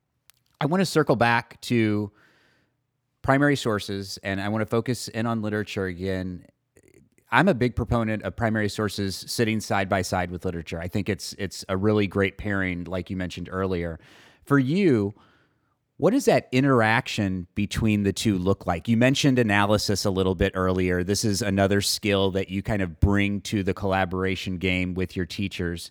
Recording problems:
none

